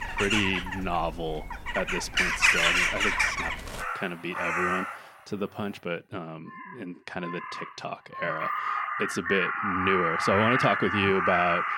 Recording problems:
animal sounds; very loud; throughout; 3 dB above the speech

